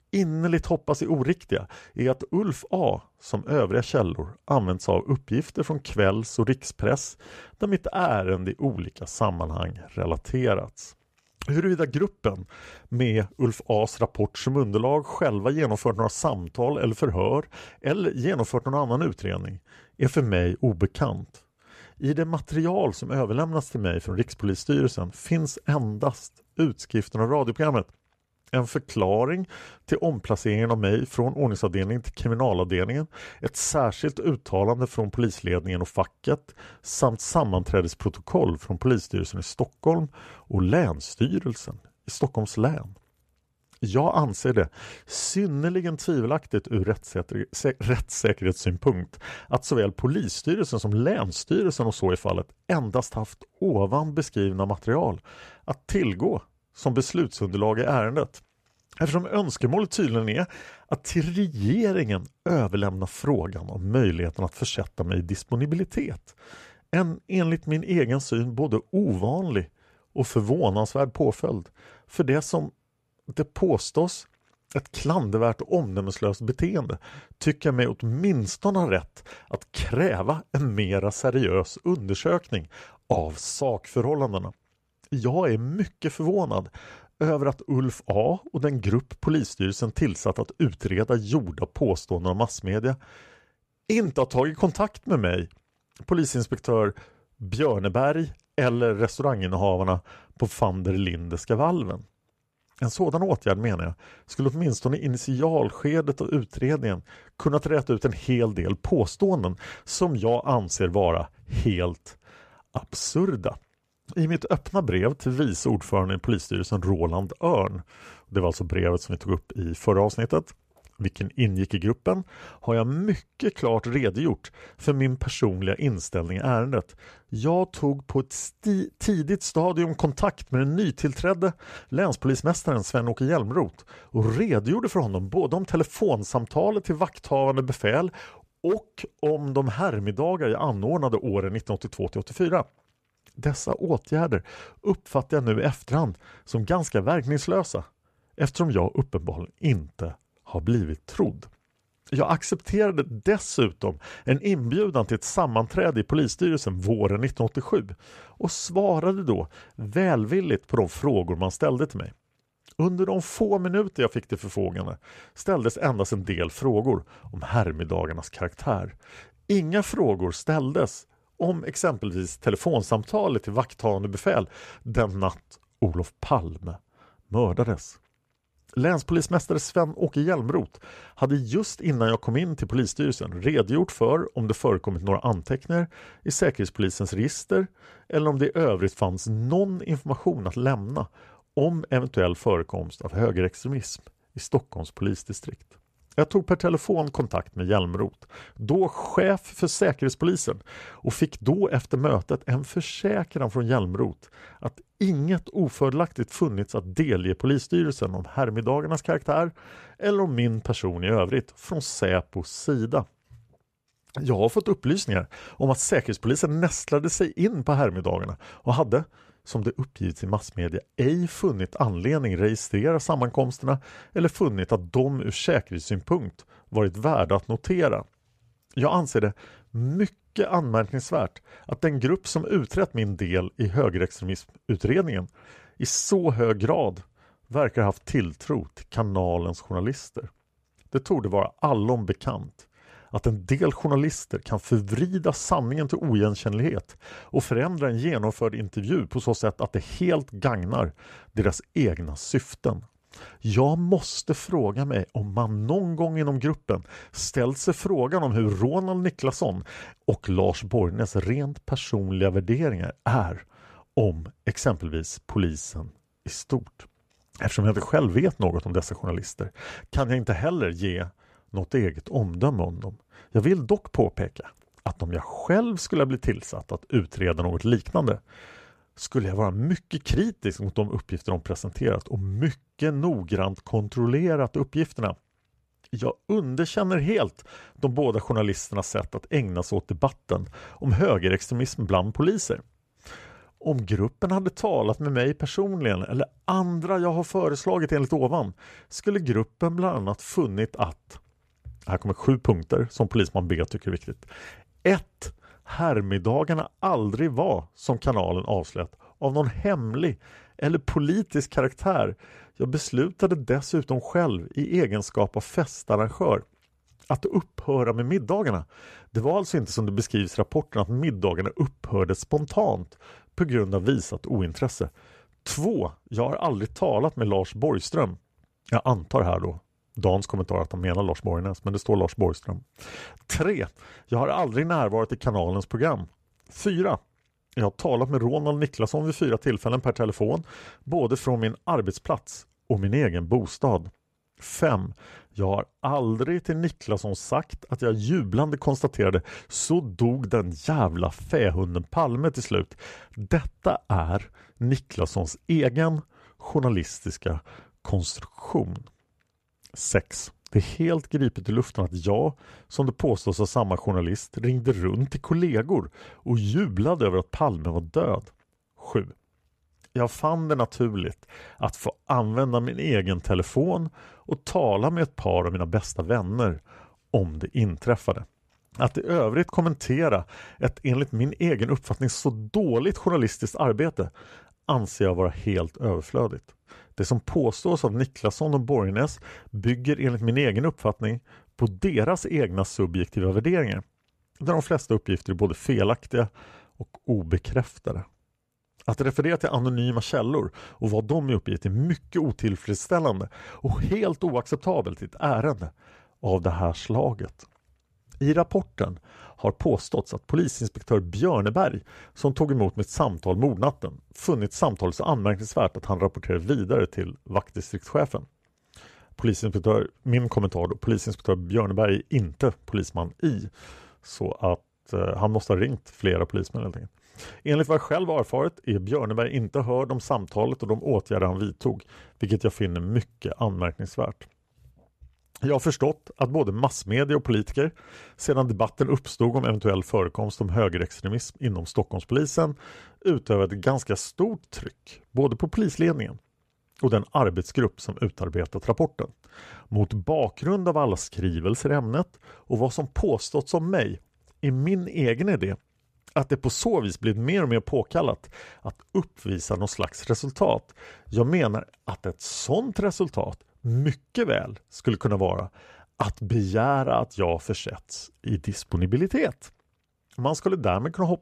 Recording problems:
none

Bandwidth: 14.5 kHz